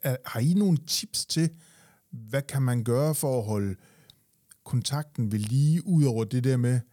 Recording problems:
none

